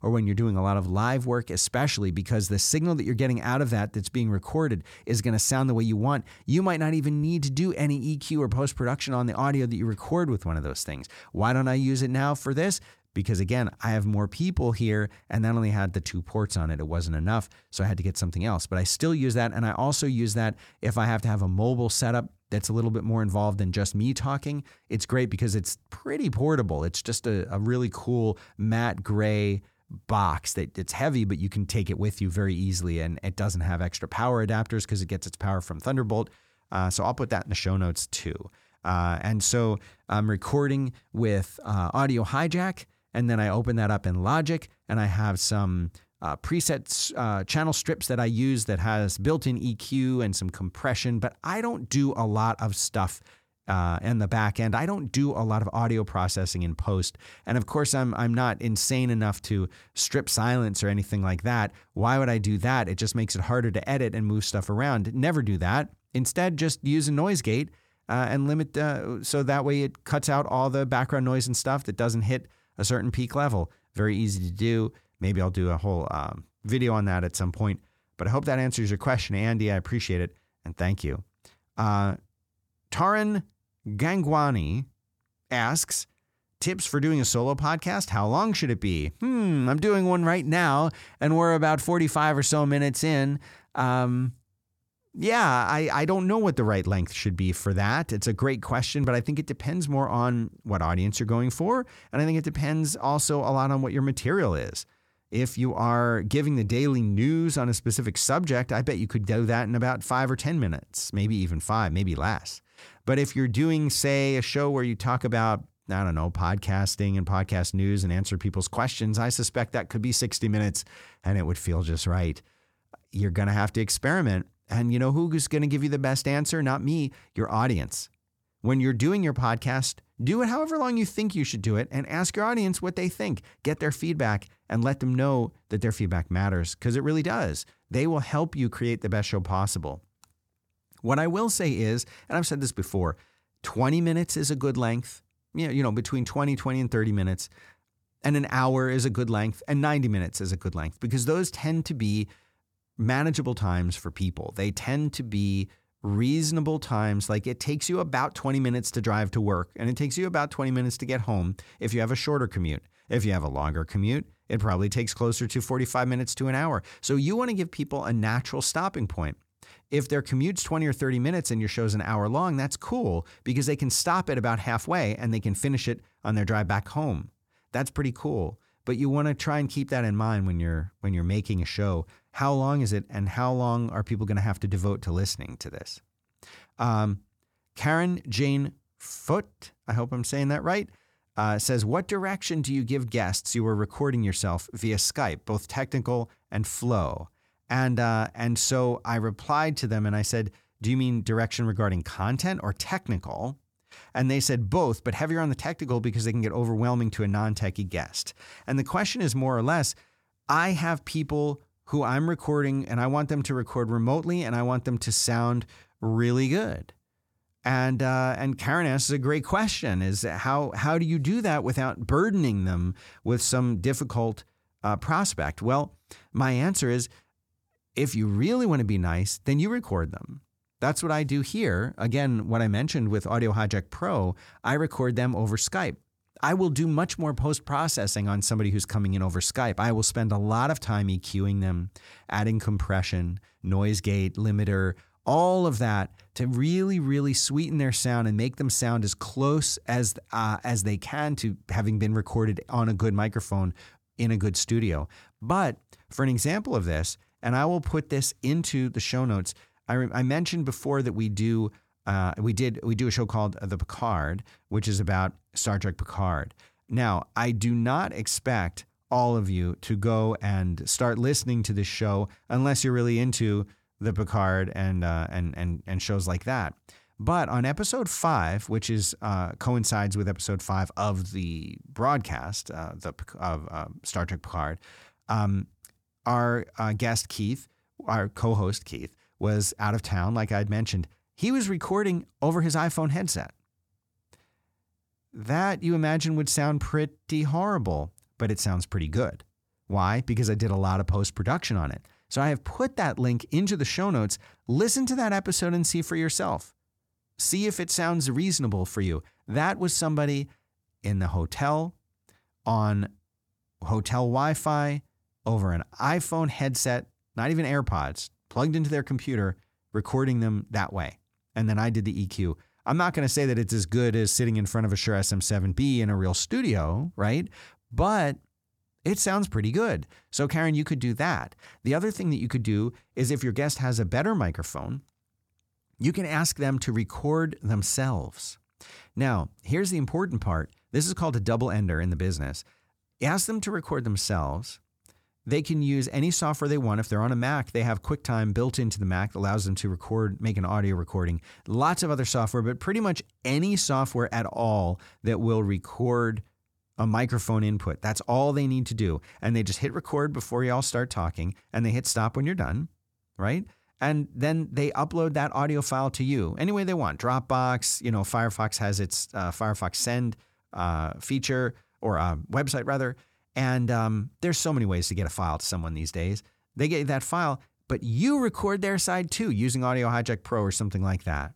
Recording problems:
none

